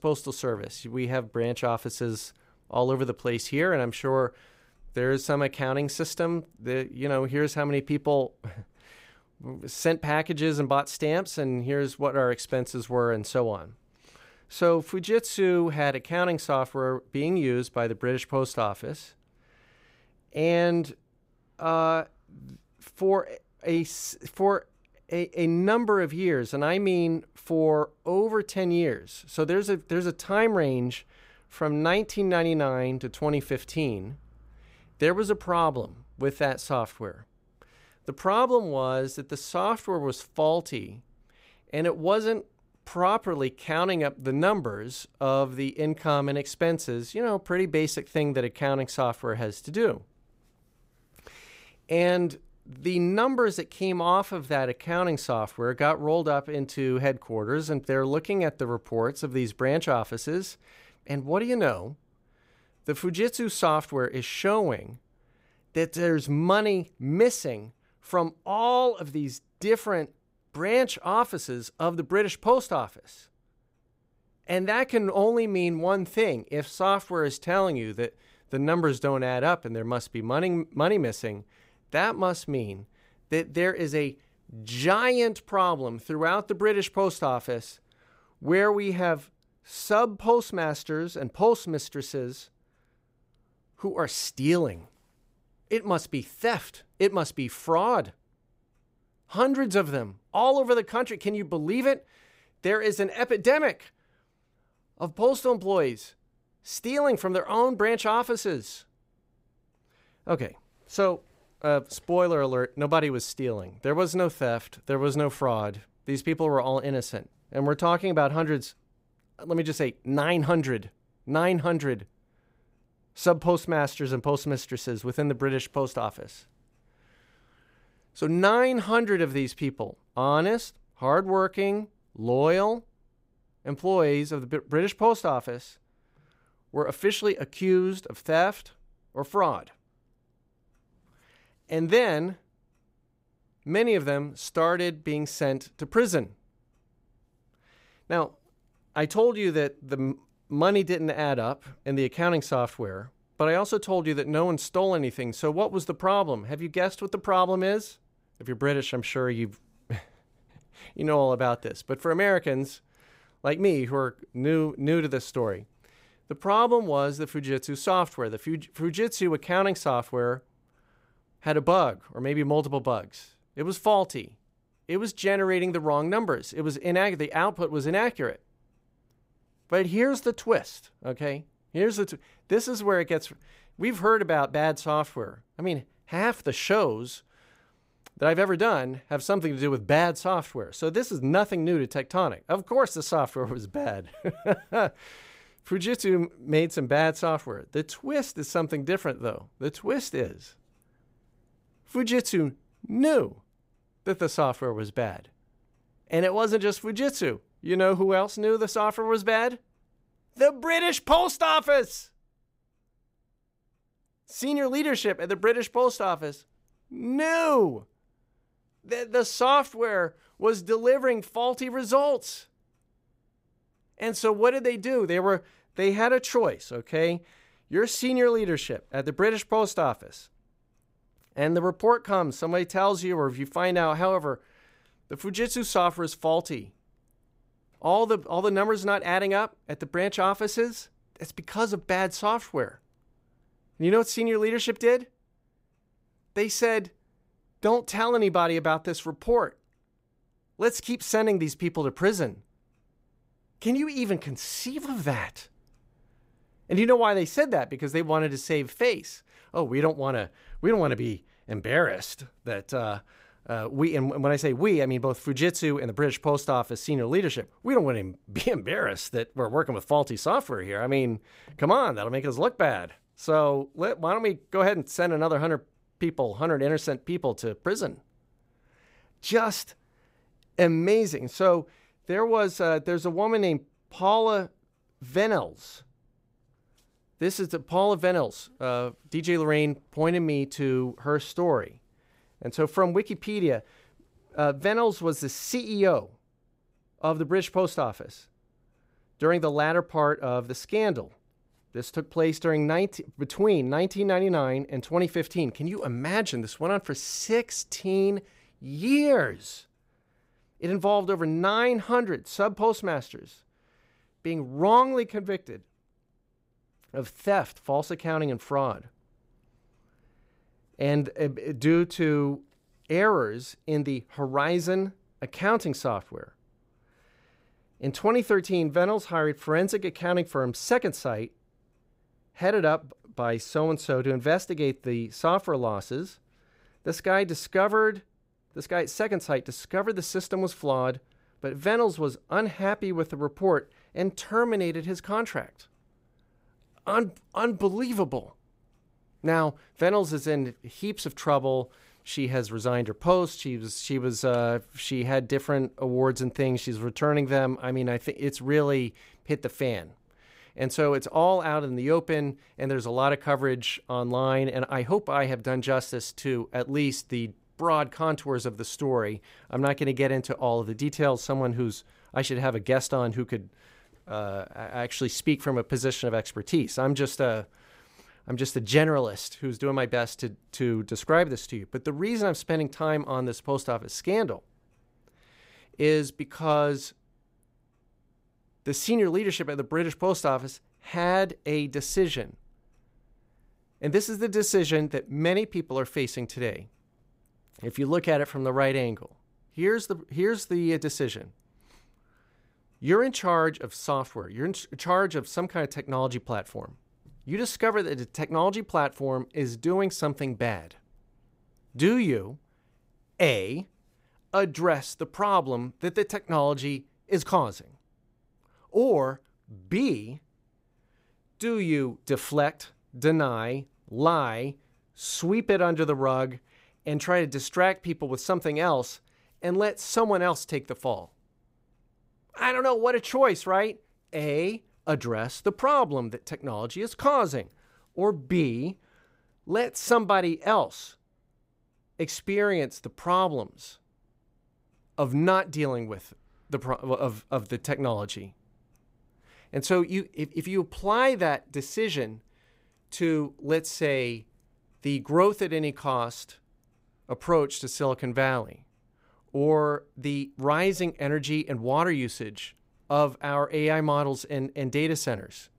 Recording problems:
none

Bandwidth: 15.5 kHz